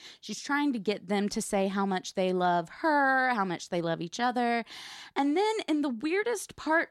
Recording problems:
none

